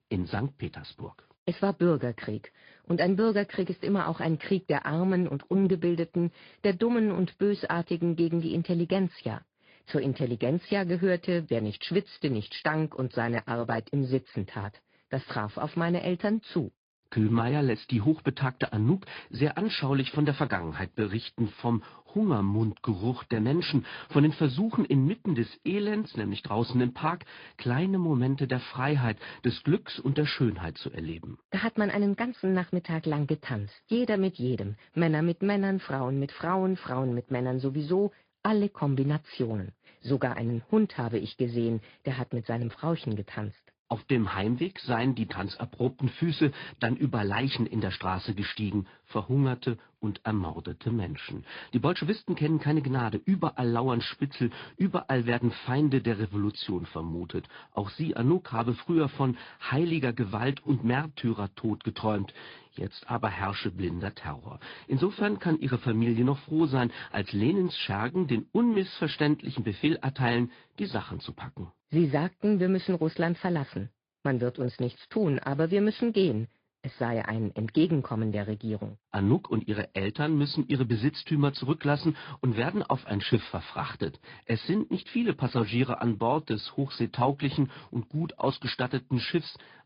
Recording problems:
high frequencies cut off; noticeable; nothing above 5 kHz
garbled, watery; slightly

